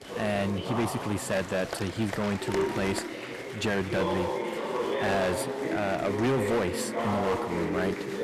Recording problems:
distortion; heavy; 10% of the sound clipped
chatter from many people; loud; throughout; 2 dB below the speech

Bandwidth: 14 kHz